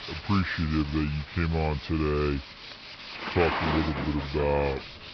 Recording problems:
wrong speed and pitch; too slow and too low; 0.7 times normal speed
garbled, watery; slightly; nothing above 5.5 kHz
high frequencies cut off; slight
rain or running water; loud; throughout; 5 dB below the speech
machinery noise; noticeable; throughout; 15 dB below the speech

